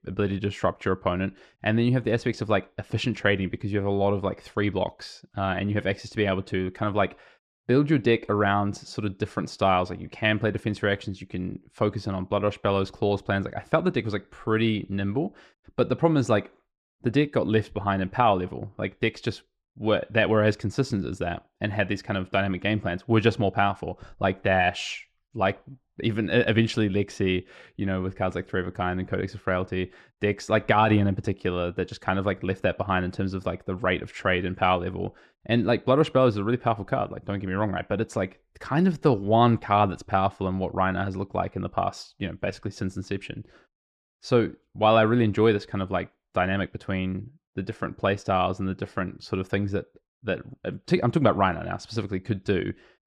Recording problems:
muffled; slightly; fading above 2 kHz

